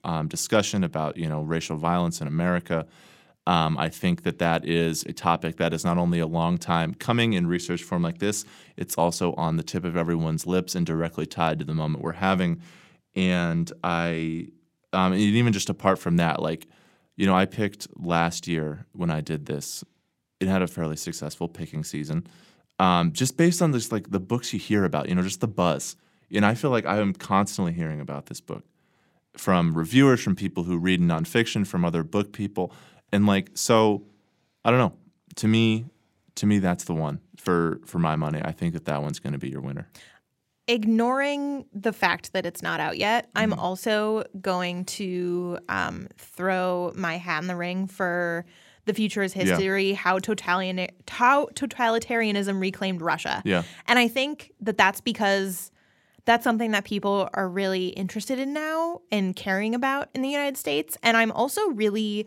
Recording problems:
none

